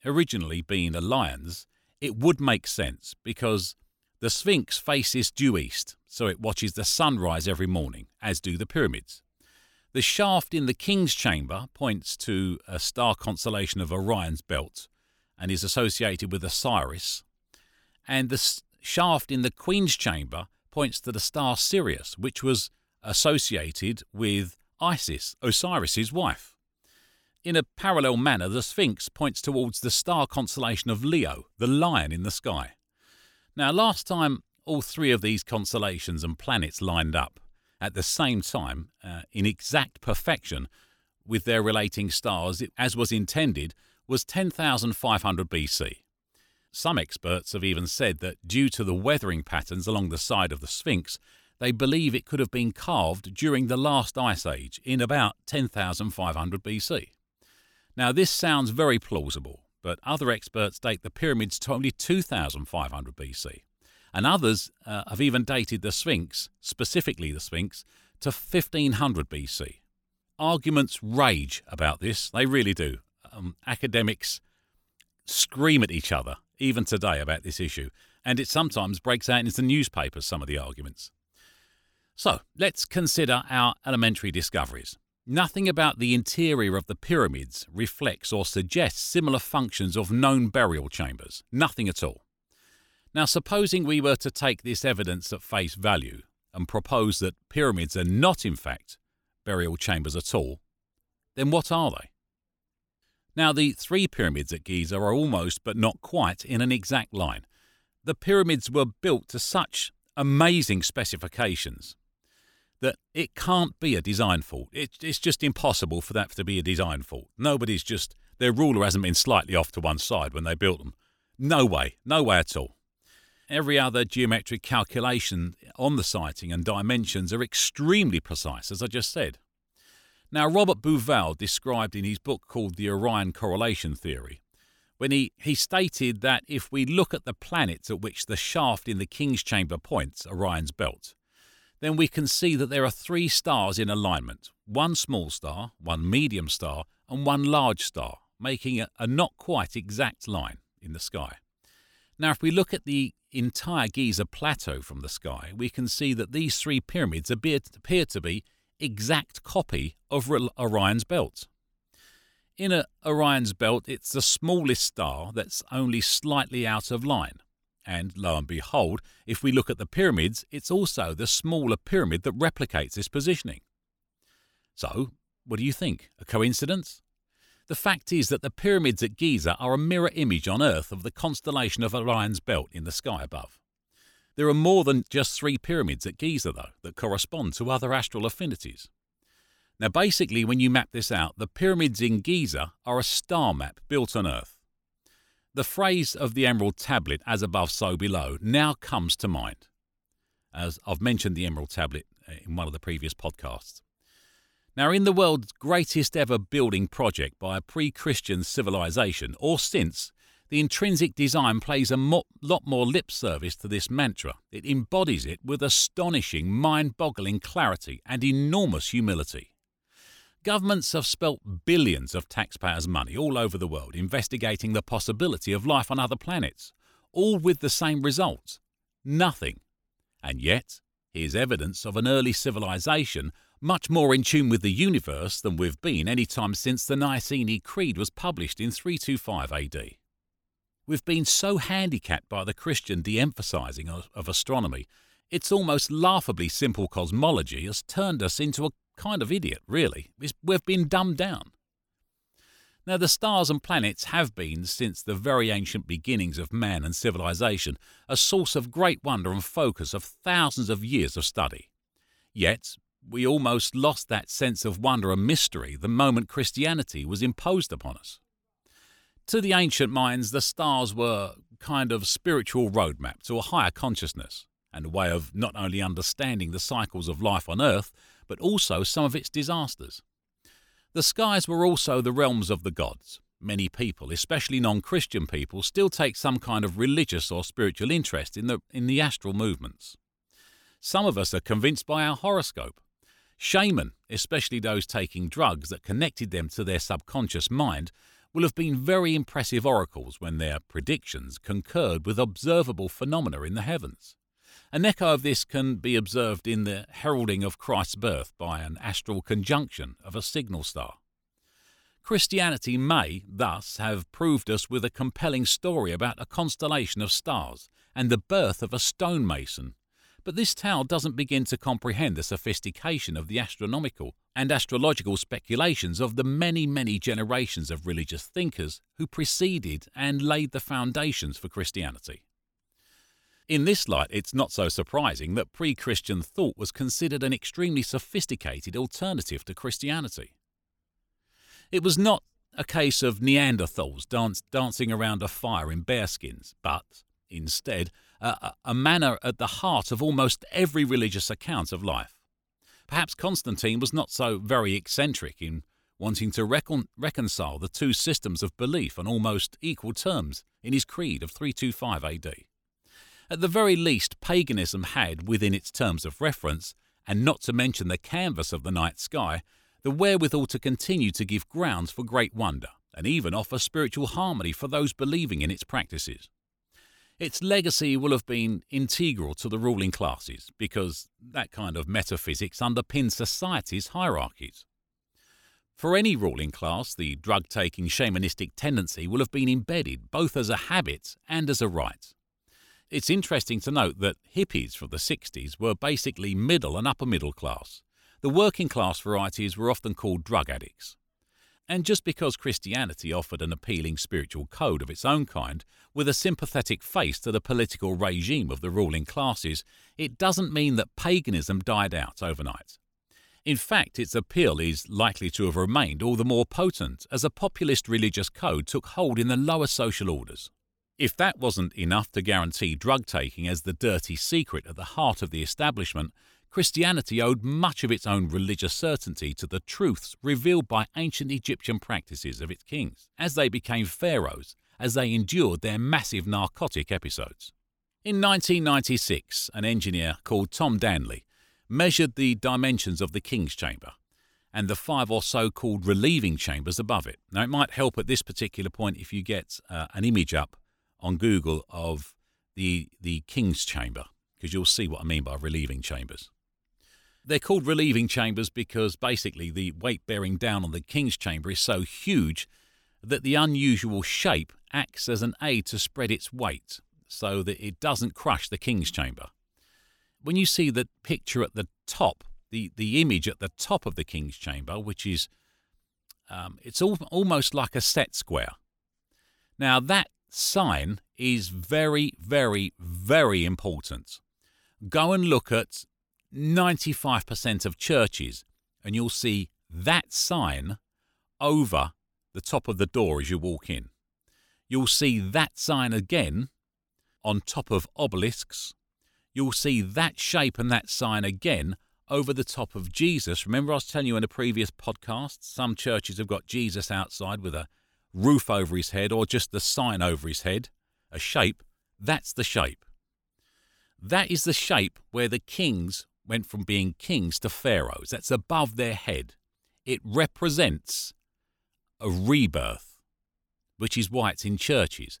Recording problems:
none

